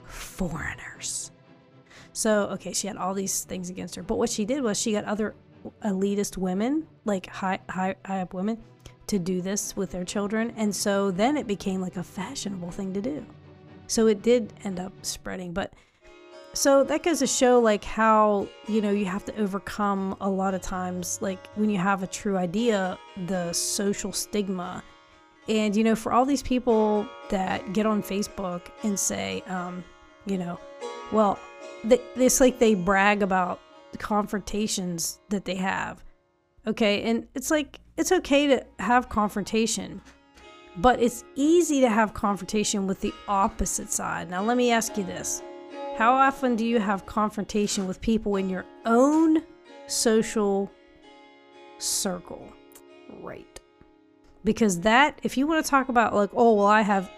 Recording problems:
background music; faint; throughout; 20 dB below the speech

